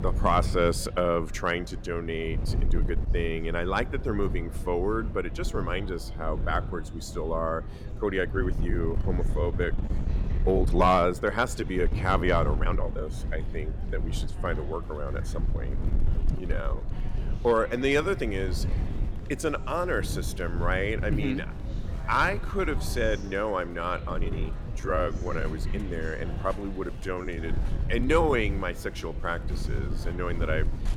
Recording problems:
chatter from many people; noticeable; throughout; 20 dB below the speech
wind noise on the microphone; occasional gusts; 15 dB below the speech
uneven, jittery; strongly; from 2.5 to 28 s

